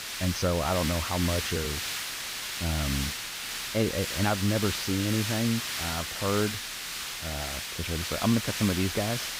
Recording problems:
garbled, watery; slightly; nothing above 6.5 kHz
hiss; loud; throughout; 2 dB below the speech

